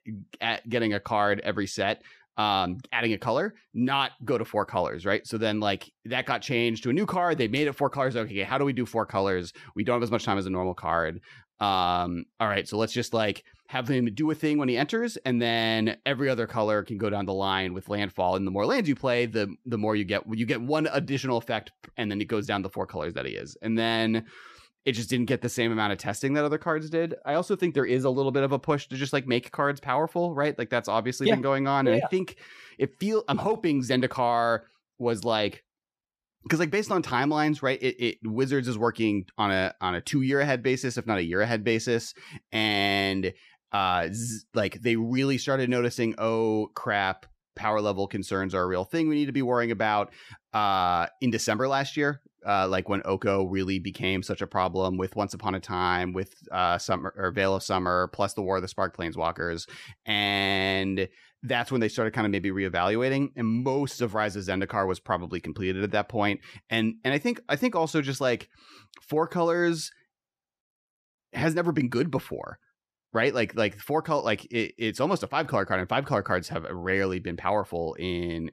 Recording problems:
none

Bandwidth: 14.5 kHz